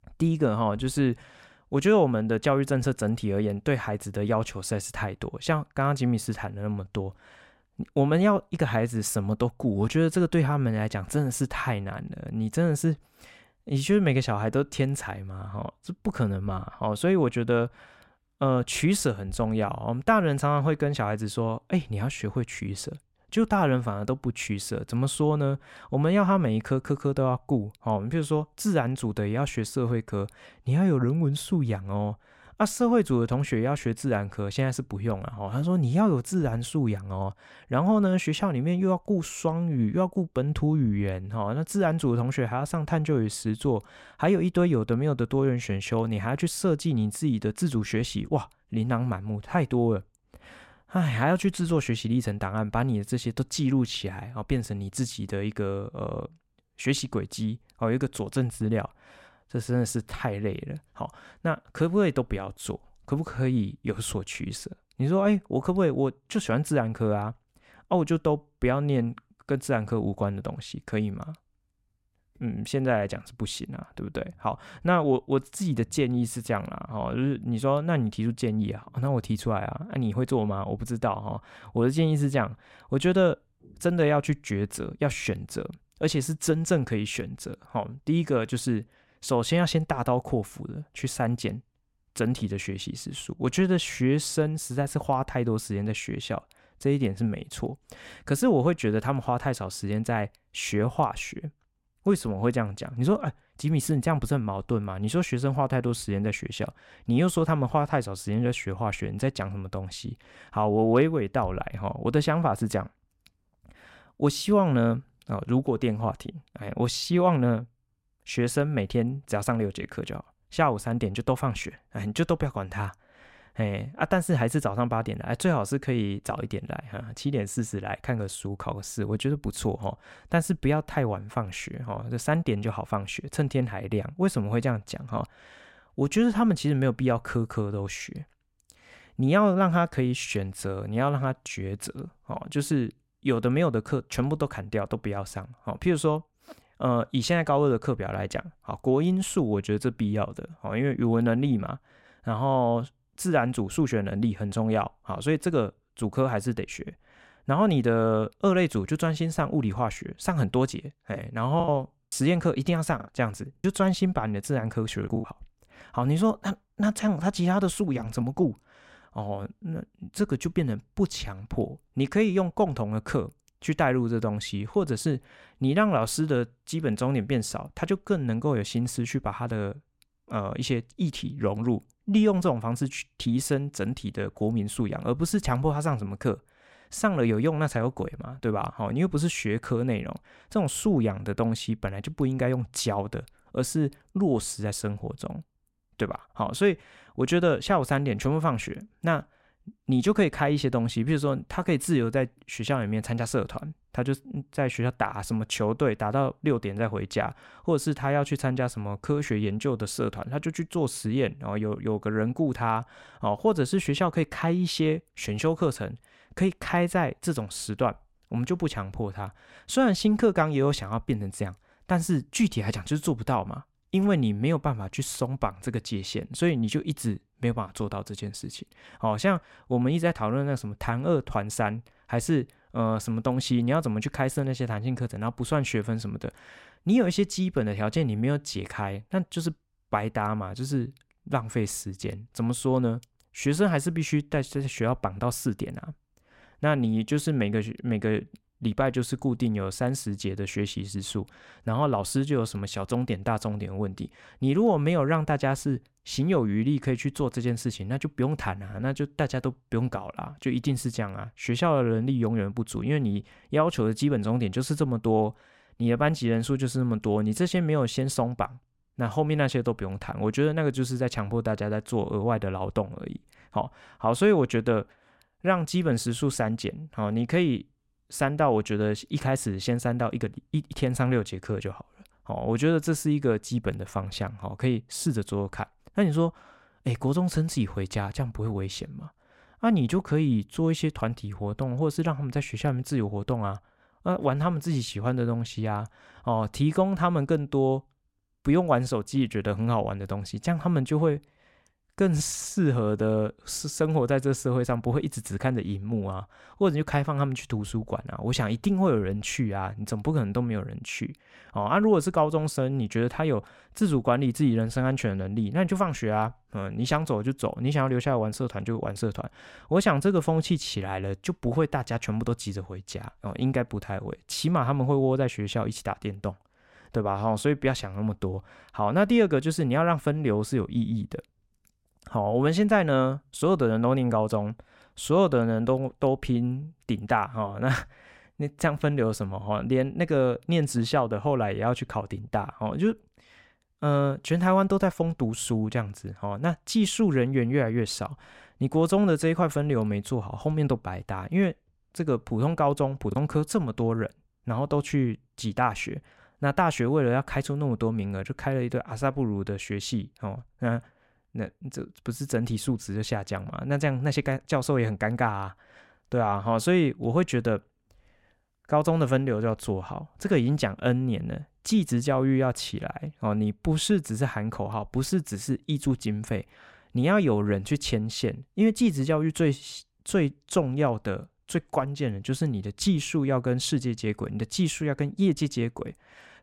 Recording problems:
choppy; very; from 2:42 to 2:45 and at 5:53; 7% of the speech affected

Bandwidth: 16 kHz